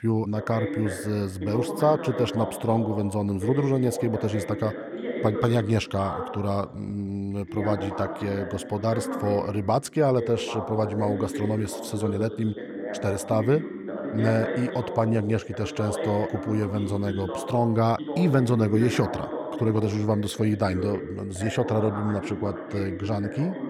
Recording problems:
voice in the background; loud; throughout; 7 dB below the speech

